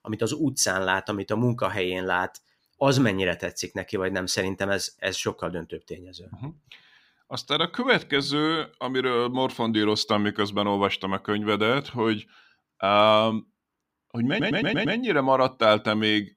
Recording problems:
audio stuttering; at 14 s

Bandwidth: 15.5 kHz